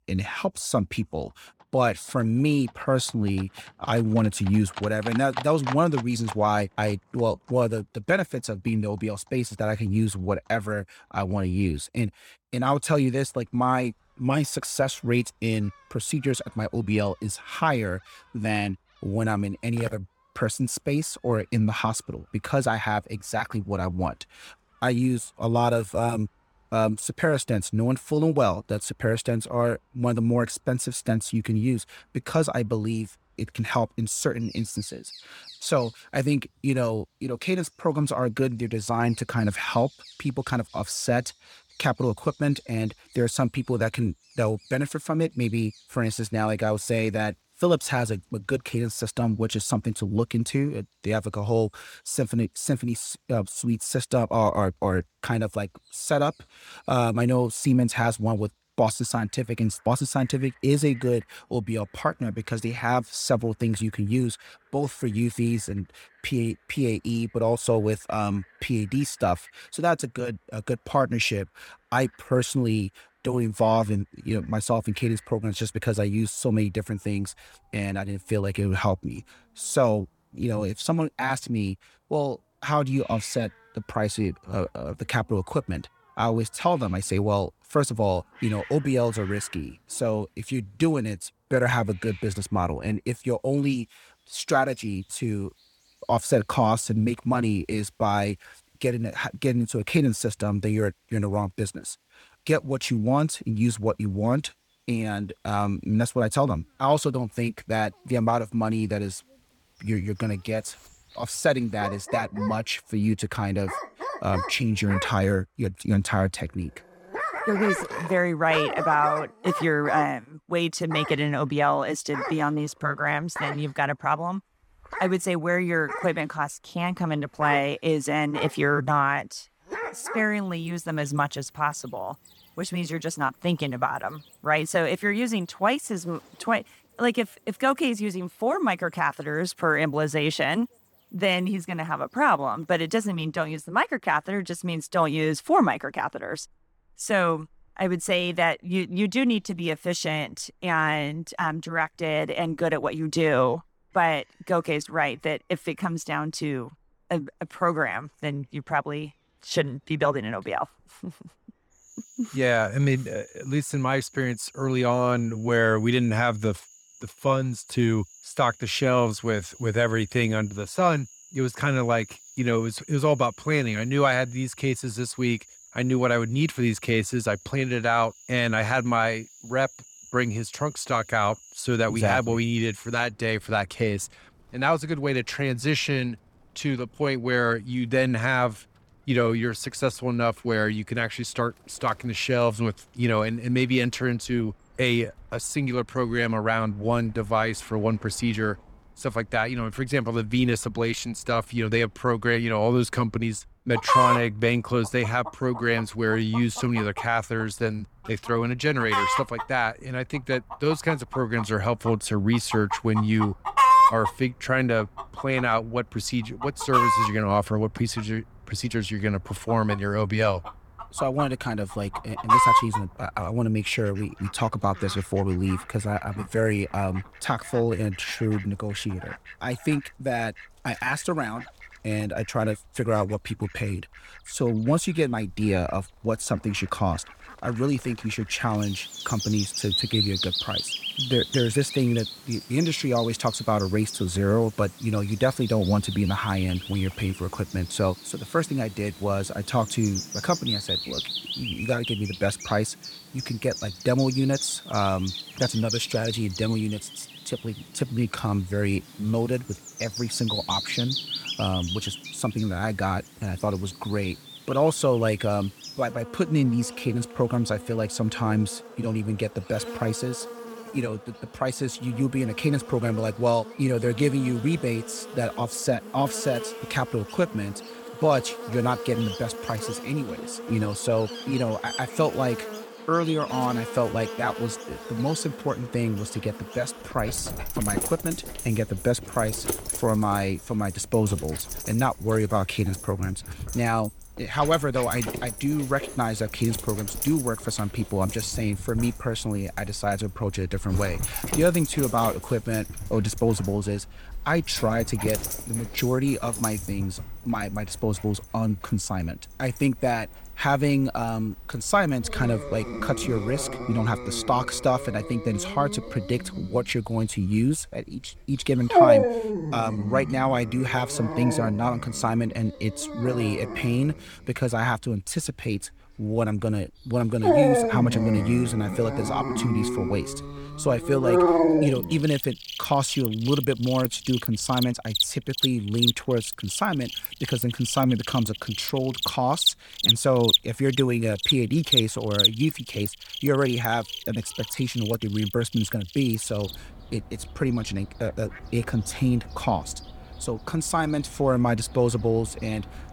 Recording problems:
animal sounds; loud; throughout; 4 dB below the speech

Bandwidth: 18.5 kHz